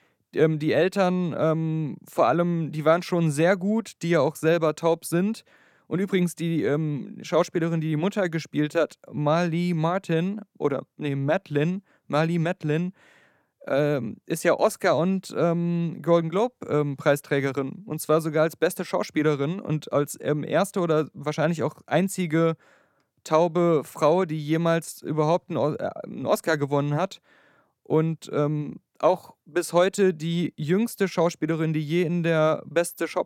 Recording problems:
none

